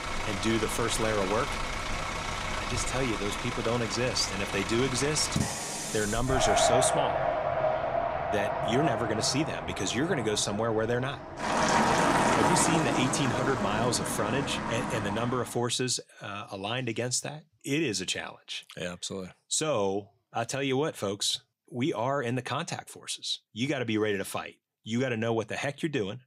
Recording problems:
traffic noise; very loud; until 15 s; as loud as the speech

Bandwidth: 15.5 kHz